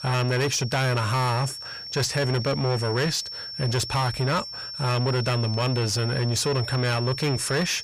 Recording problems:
distortion; heavy; 7 dB below the speech
high-pitched whine; loud; throughout; 5.5 kHz, 8 dB below the speech

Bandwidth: 15 kHz